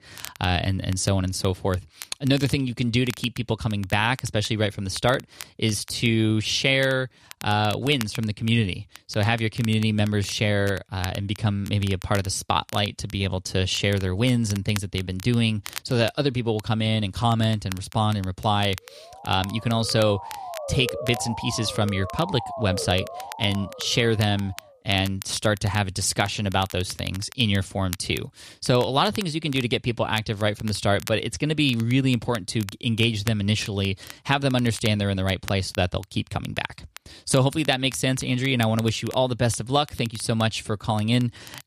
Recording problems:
crackle, like an old record; noticeable; 20 dB below the speech
siren; noticeable; from 19 to 25 s; peak 7 dB below the speech

